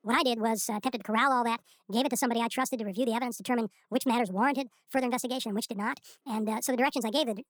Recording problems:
wrong speed and pitch; too fast and too high; 1.5 times normal speed

